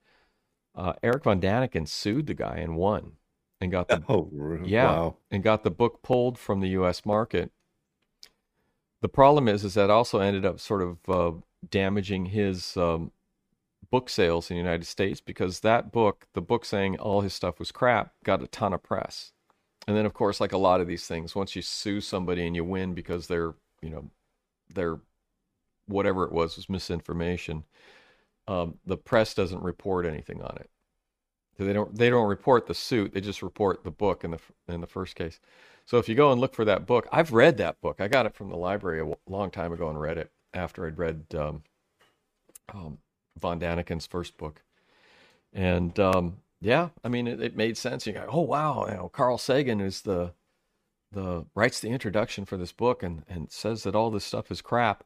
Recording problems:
none

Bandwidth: 15 kHz